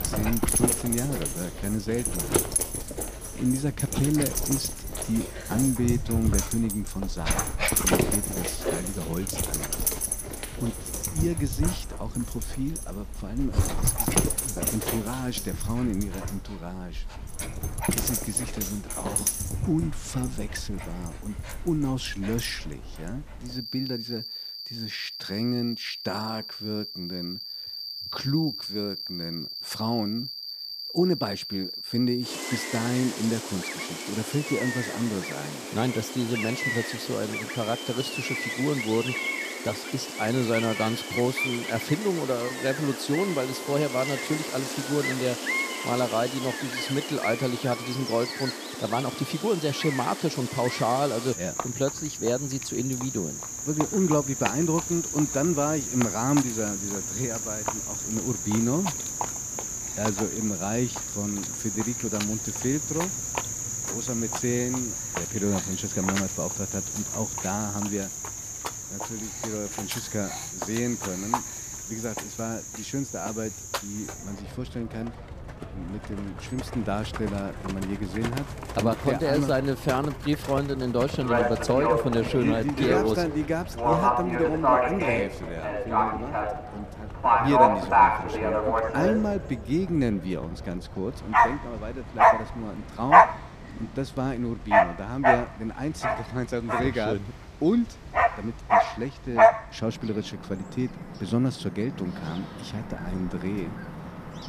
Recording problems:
animal sounds; very loud; throughout; 1 dB above the speech

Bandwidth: 14.5 kHz